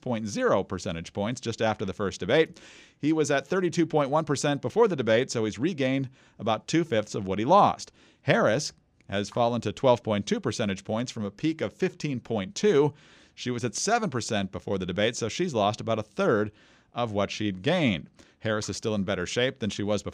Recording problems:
none

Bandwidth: 15 kHz